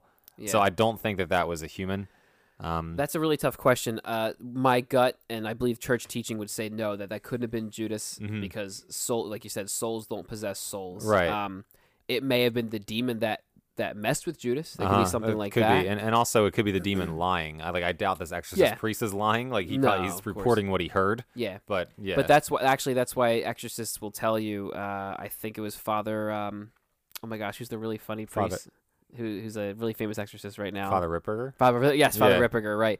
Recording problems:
none

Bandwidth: 15 kHz